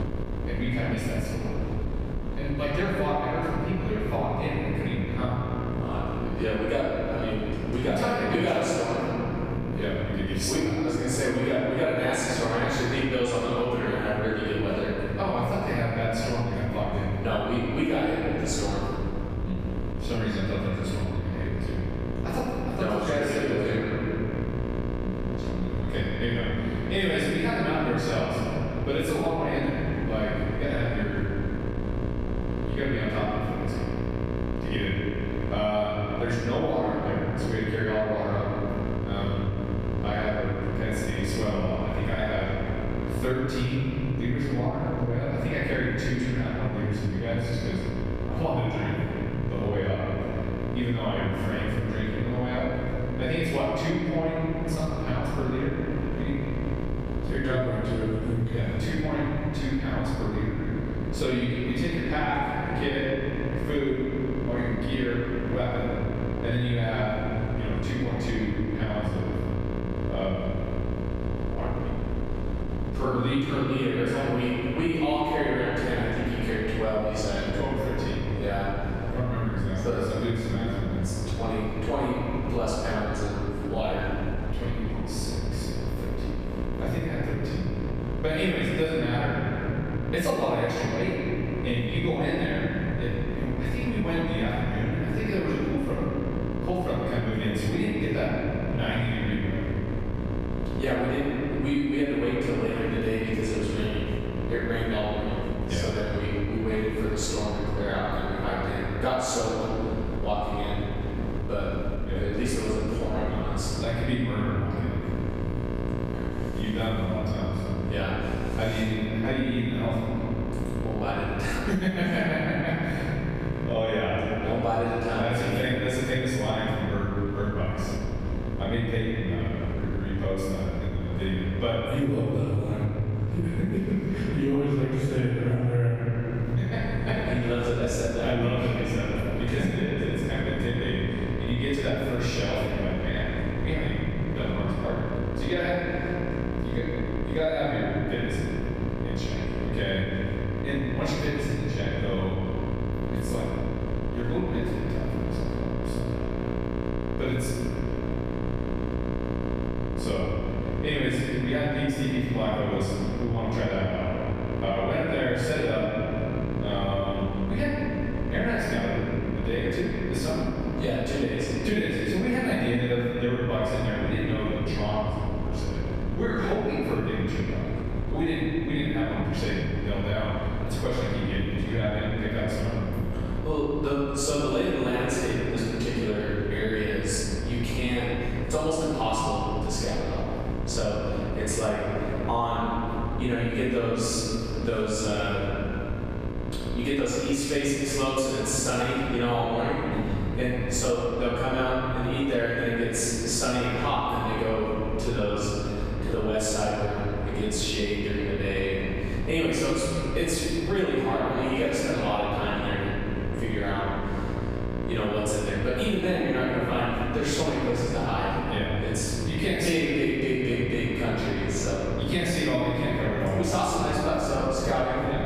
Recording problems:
room echo; strong; dies away in 2.6 s
off-mic speech; far
squashed, flat; somewhat
electrical hum; noticeable; throughout; 60 Hz, 10 dB below the speech
wind noise on the microphone; occasional gusts; 15 dB below the speech

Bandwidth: 14.5 kHz